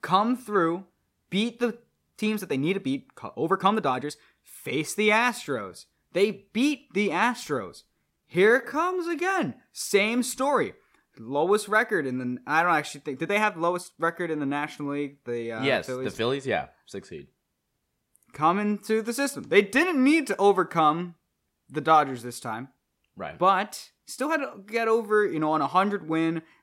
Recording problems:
uneven, jittery; strongly; from 2 to 24 s

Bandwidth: 16 kHz